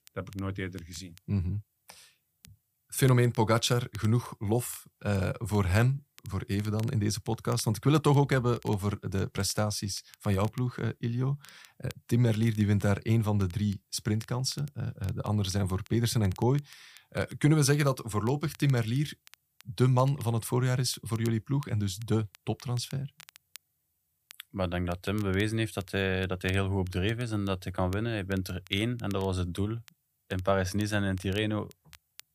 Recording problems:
crackle, like an old record; faint; 25 dB below the speech

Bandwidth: 15 kHz